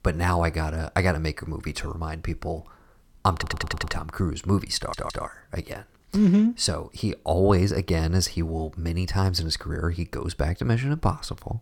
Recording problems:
audio stuttering; at 3.5 s and at 5 s

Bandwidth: 17 kHz